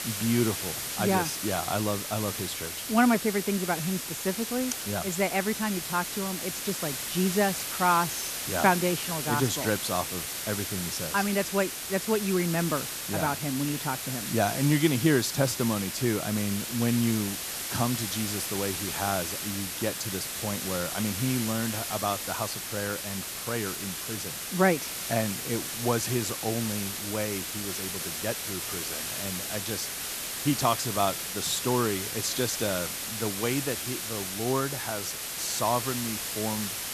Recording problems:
hiss; loud; throughout; 2 dB below the speech

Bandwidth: 14 kHz